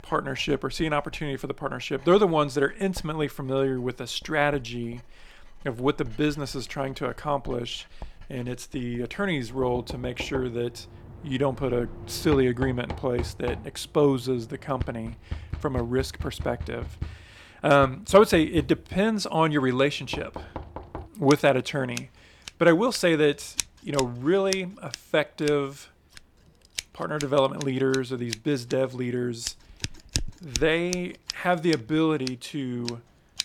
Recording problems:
household noises; noticeable; throughout; 10 dB below the speech

